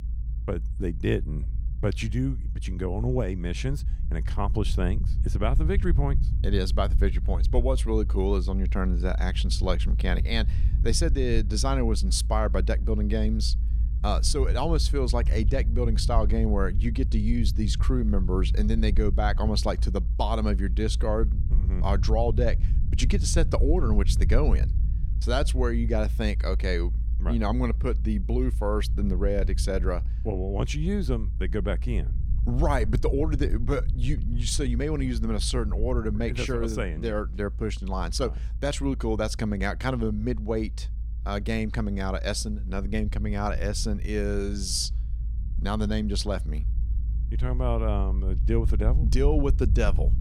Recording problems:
low rumble; noticeable; throughout; 15 dB below the speech

